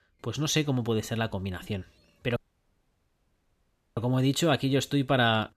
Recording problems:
audio cutting out; at 2.5 s for 1.5 s

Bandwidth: 14.5 kHz